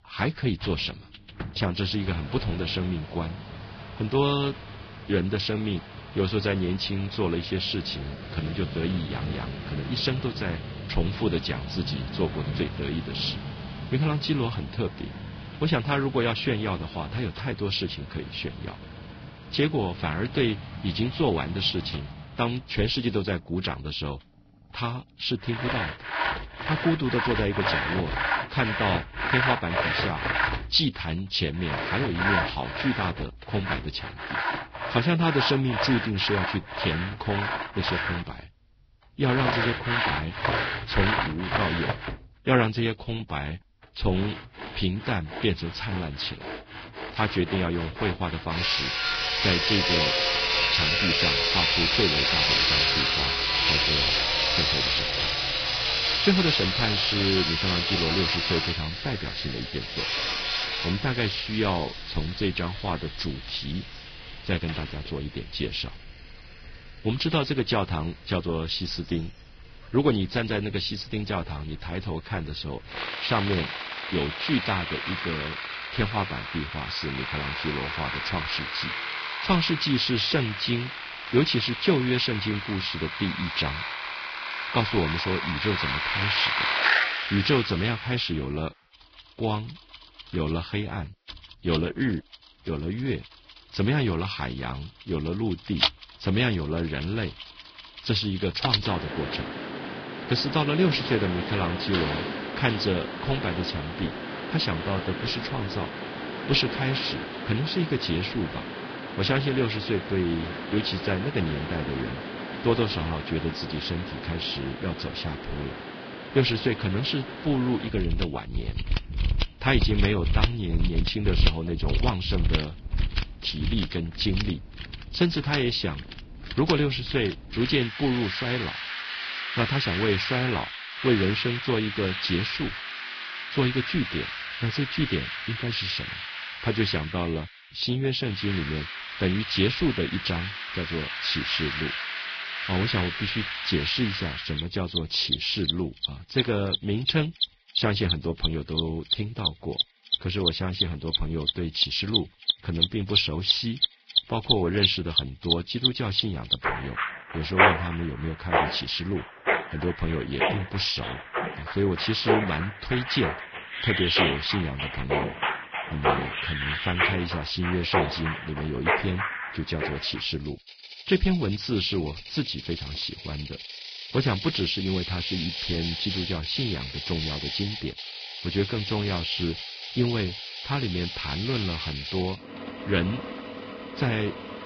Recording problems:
garbled, watery; badly; nothing above 5 kHz
machinery noise; loud; throughout; 1 dB below the speech

